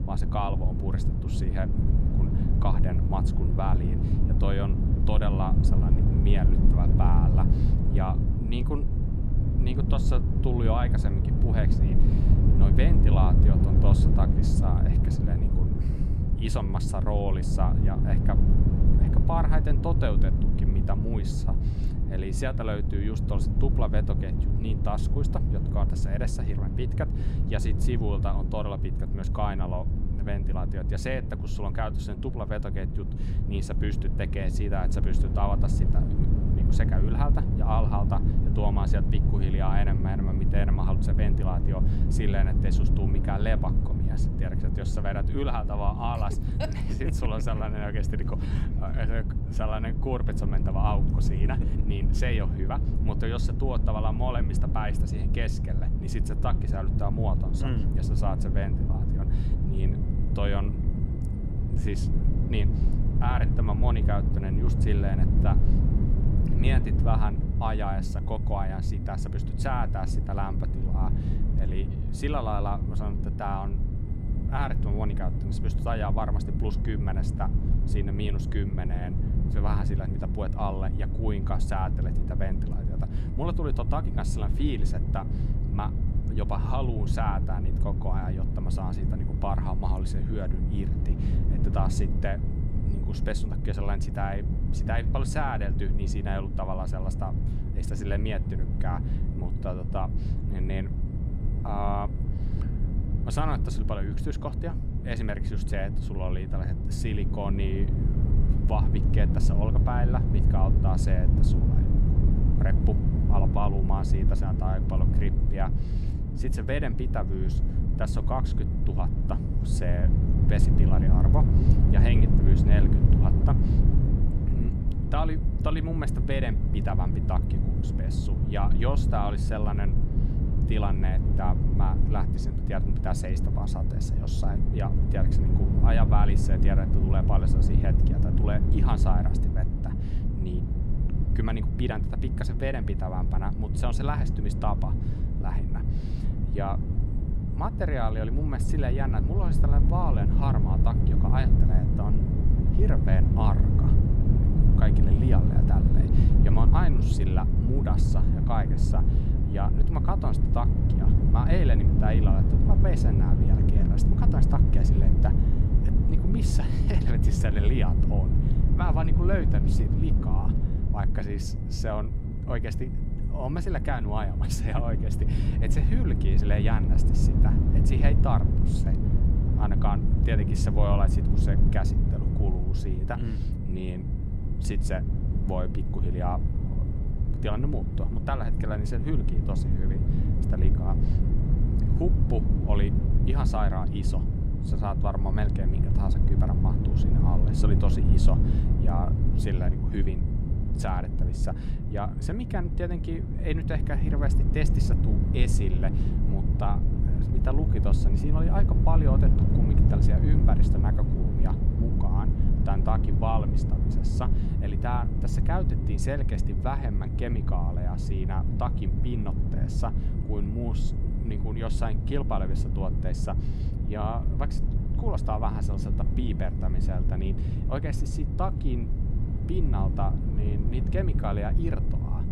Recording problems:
low rumble; loud; throughout; 3 dB below the speech
high-pitched whine; faint; from 1:00 on; 2 kHz, 35 dB below the speech

